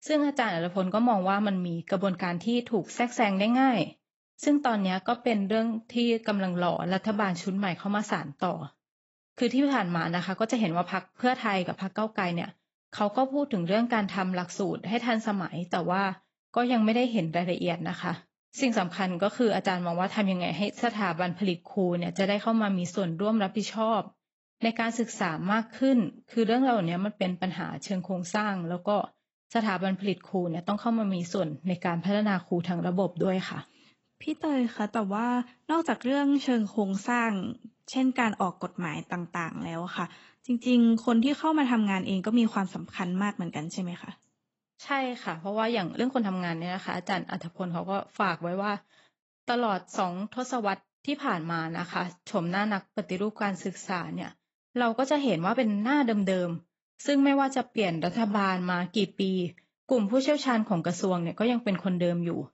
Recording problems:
garbled, watery; badly; nothing above 8 kHz
uneven, jittery; strongly; from 5 to 59 s

